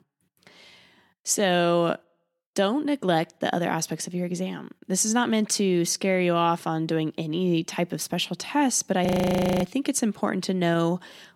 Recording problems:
audio freezing; at 9 s for 0.5 s

